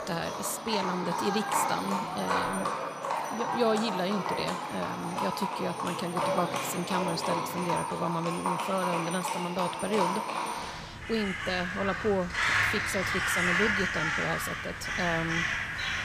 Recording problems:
animal sounds; very loud; throughout; 2 dB above the speech

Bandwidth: 15 kHz